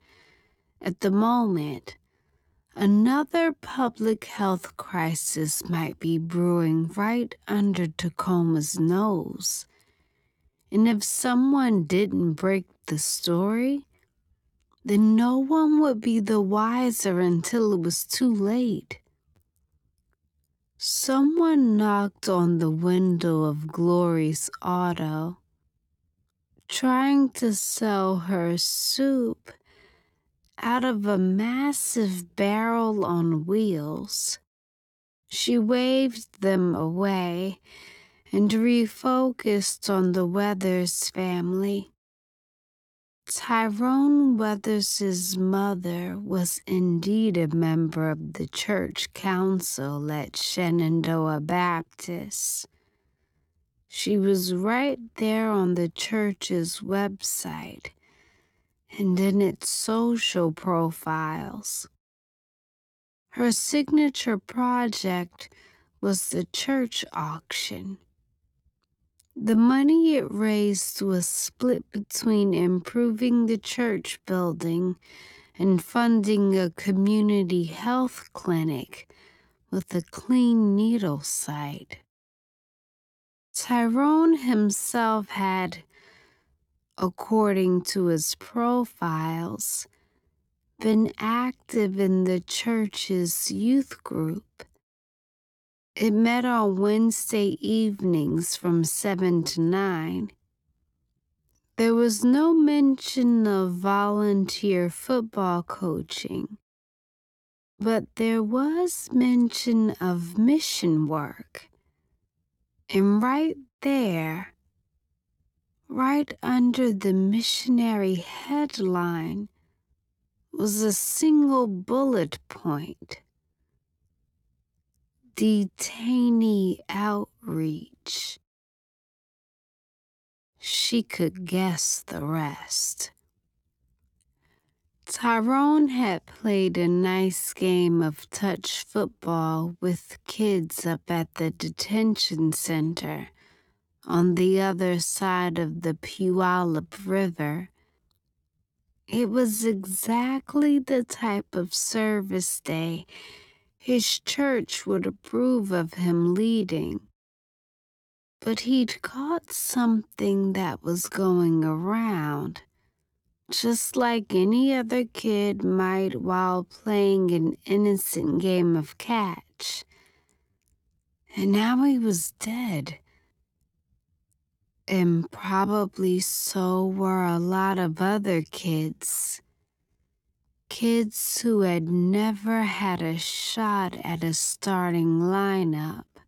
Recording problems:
wrong speed, natural pitch; too slow; 0.6 times normal speed

